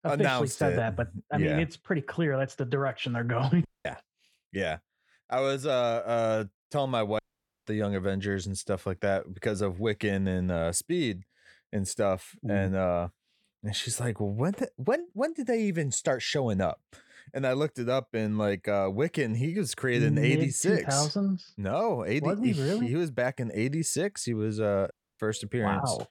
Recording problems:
audio cutting out; at 3.5 s, at 7 s and at 25 s

